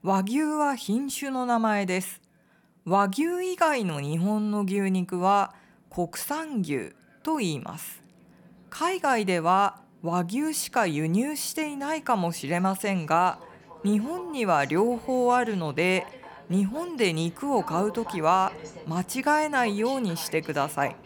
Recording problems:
train or aircraft noise; noticeable; throughout; 20 dB below the speech

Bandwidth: 18 kHz